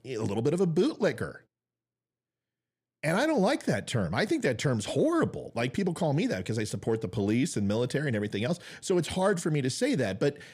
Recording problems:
none

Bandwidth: 14.5 kHz